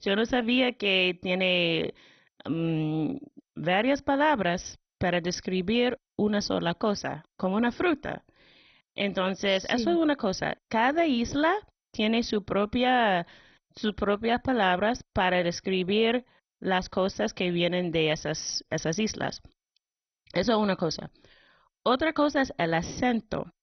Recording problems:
garbled, watery; badly; nothing above 6 kHz

